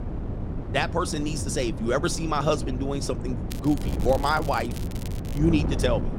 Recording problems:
wind noise on the microphone; occasional gusts; 10 dB below the speech
crackling; noticeable; from 3.5 to 5.5 s; 15 dB below the speech

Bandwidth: 16 kHz